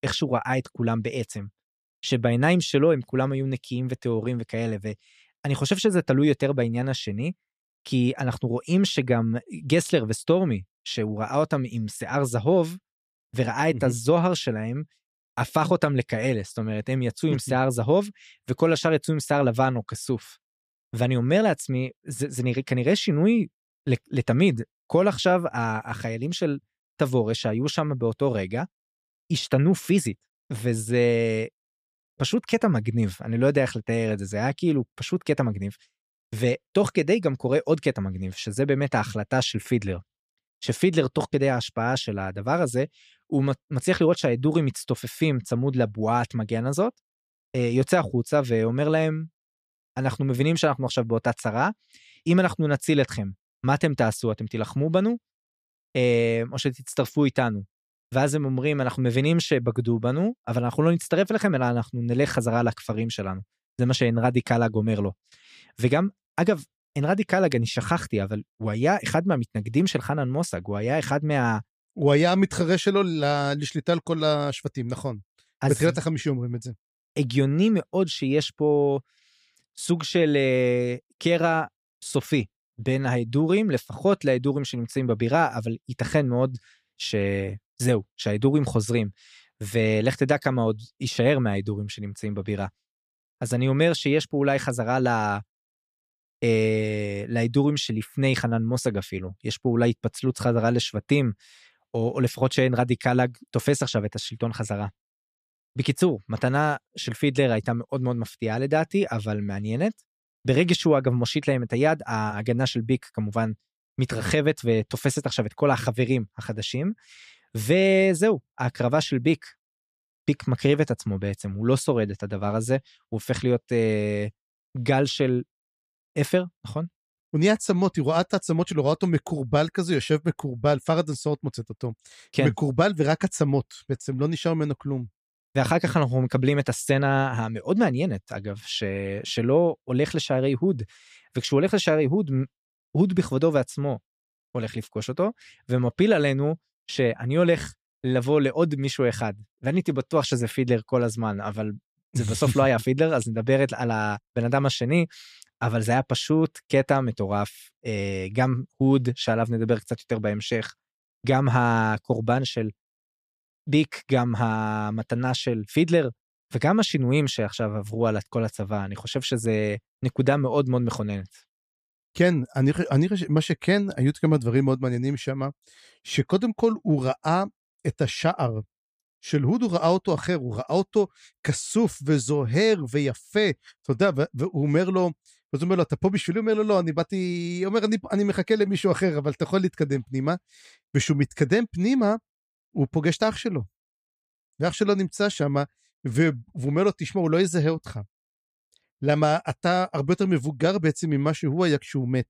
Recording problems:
none

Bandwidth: 15 kHz